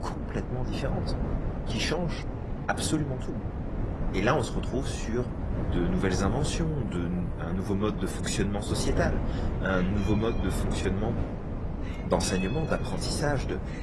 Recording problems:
garbled, watery; slightly; nothing above 11 kHz
wind noise on the microphone; heavy; 6 dB below the speech
animal sounds; noticeable; throughout; 15 dB below the speech

